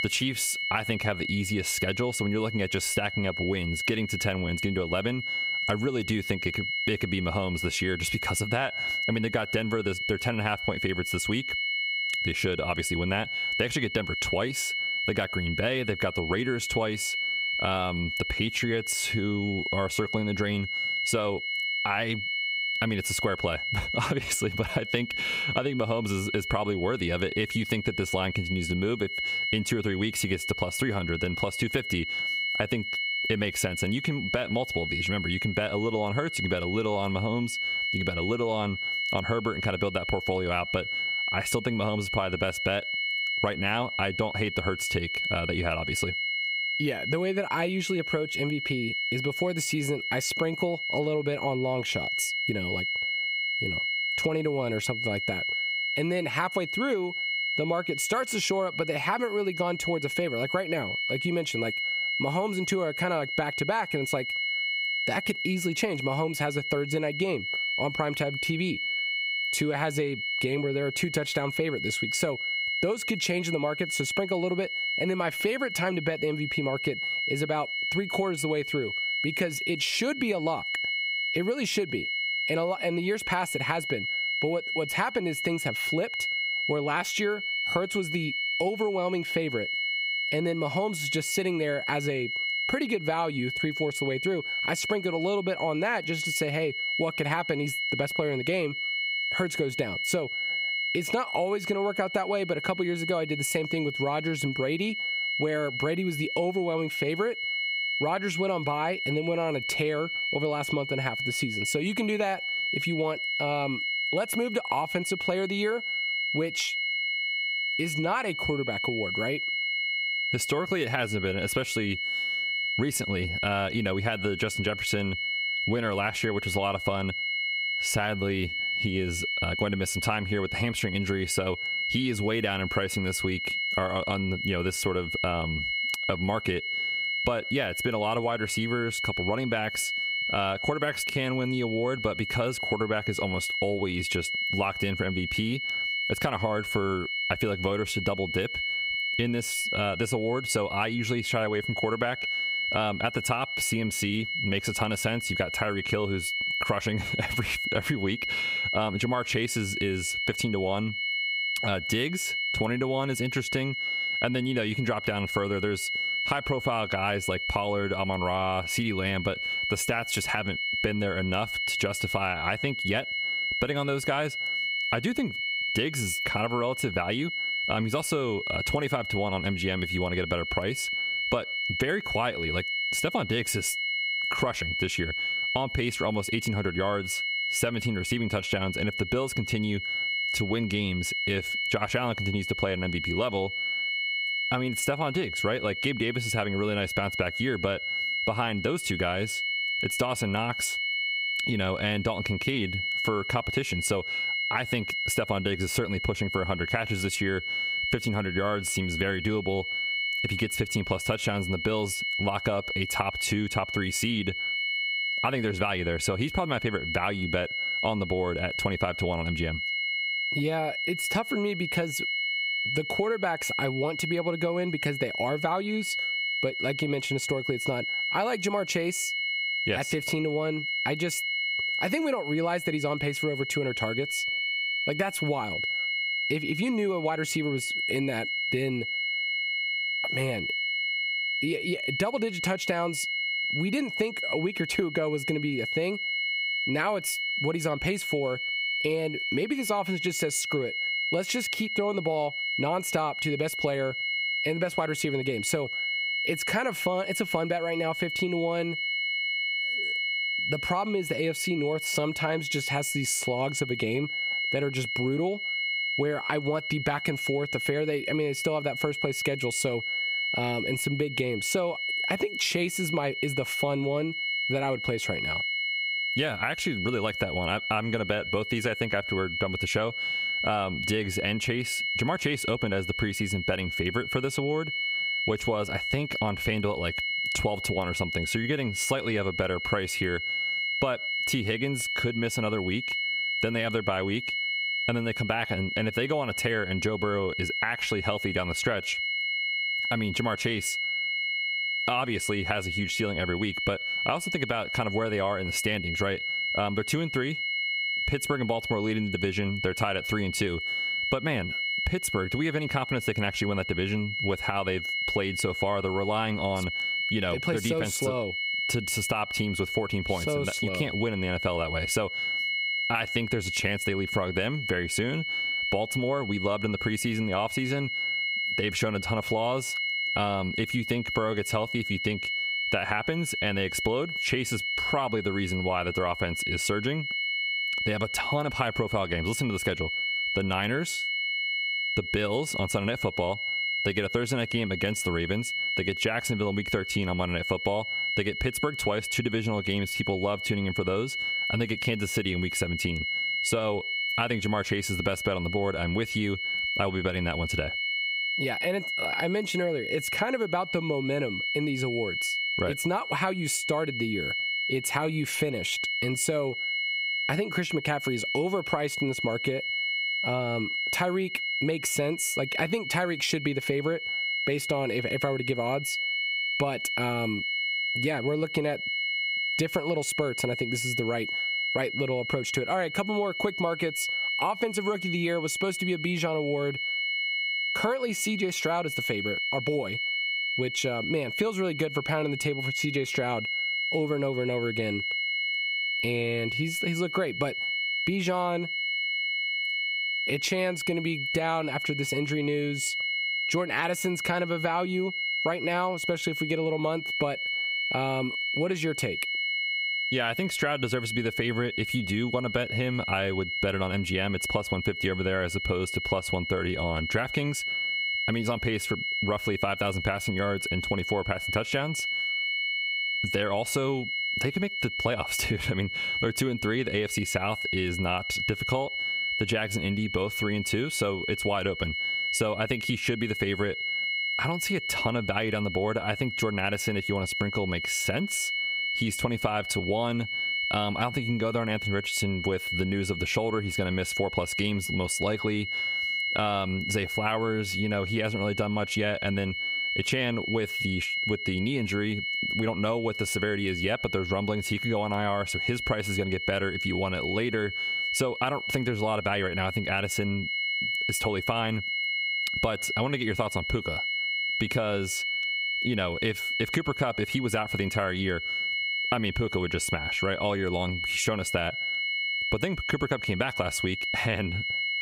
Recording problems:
squashed, flat; somewhat
high-pitched whine; loud; throughout; 2 kHz, 1 dB below the speech

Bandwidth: 15.5 kHz